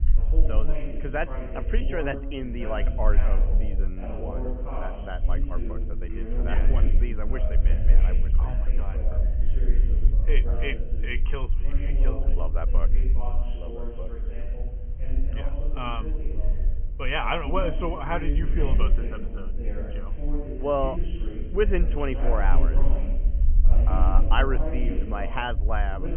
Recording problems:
high frequencies cut off; severe; nothing above 3 kHz
voice in the background; loud; throughout; 7 dB below the speech
low rumble; noticeable; throughout; 20 dB below the speech
hiss; faint; throughout; 25 dB below the speech

